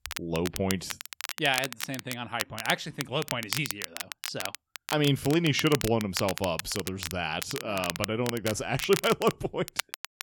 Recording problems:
crackle, like an old record; loud; 7 dB below the speech

